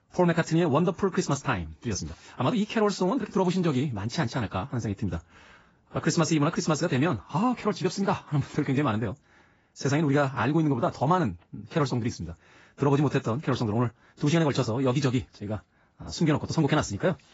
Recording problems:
garbled, watery; badly; nothing above 7.5 kHz
wrong speed, natural pitch; too fast; 1.5 times normal speed

